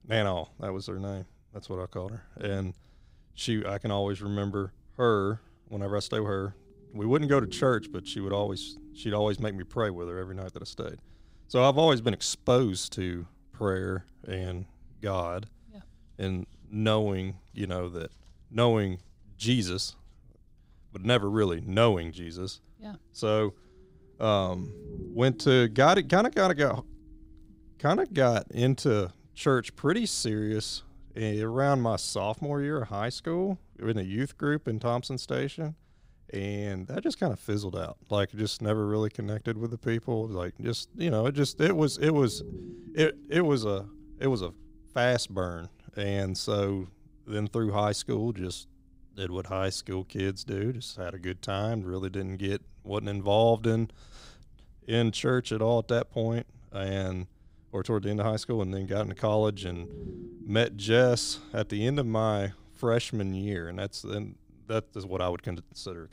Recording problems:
low rumble; faint; throughout; 25 dB below the speech

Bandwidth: 15.5 kHz